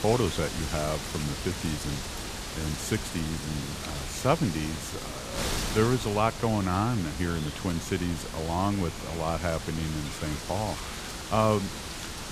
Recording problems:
wind noise on the microphone; heavy; 5 dB below the speech

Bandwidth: 14.5 kHz